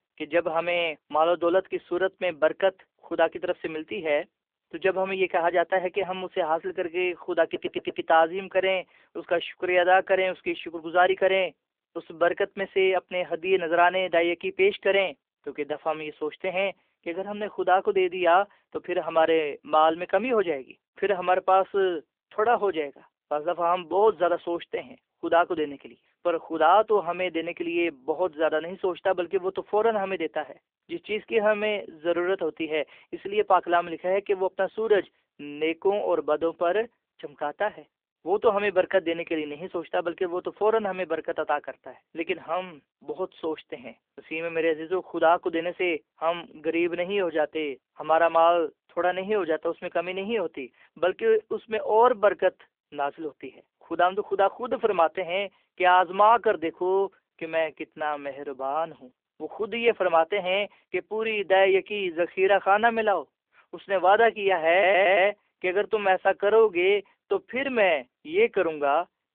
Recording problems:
phone-call audio
audio stuttering; at 7.5 s and at 1:05

